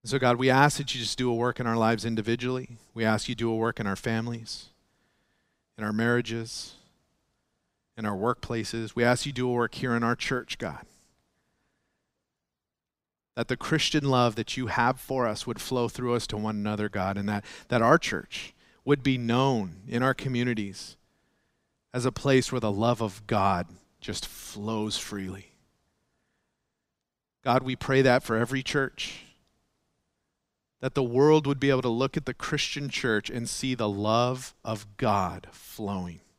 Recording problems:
none

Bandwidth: 15.5 kHz